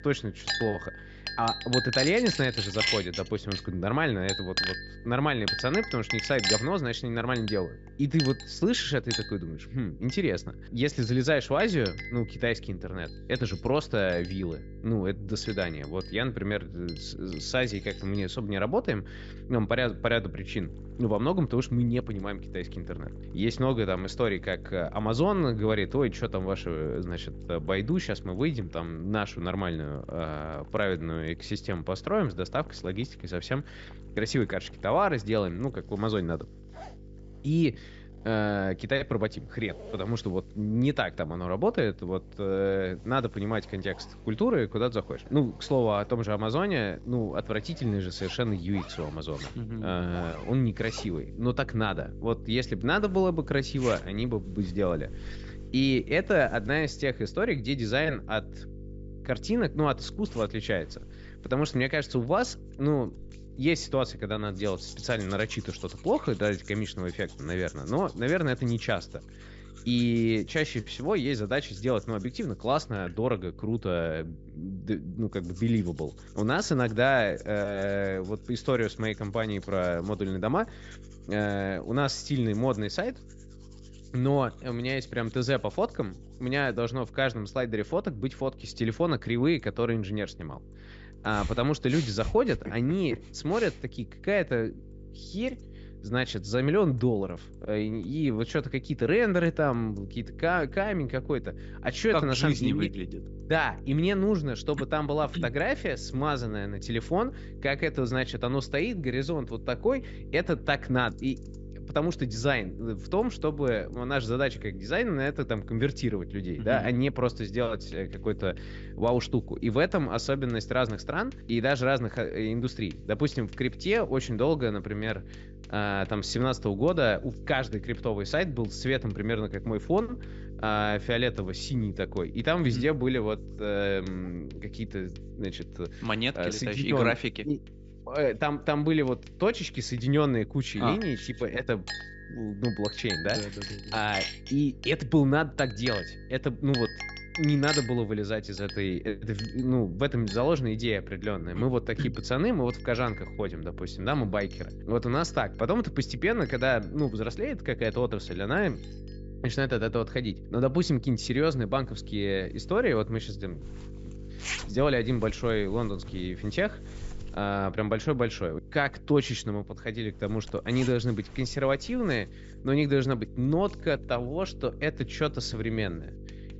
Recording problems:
high frequencies cut off; noticeable; nothing above 8 kHz
household noises; loud; throughout; 8 dB below the speech
electrical hum; faint; throughout; 50 Hz, 25 dB below the speech

